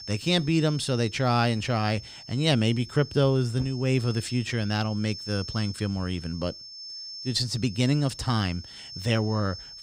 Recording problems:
high-pitched whine; noticeable; throughout; 5.5 kHz, 15 dB below the speech

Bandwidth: 15.5 kHz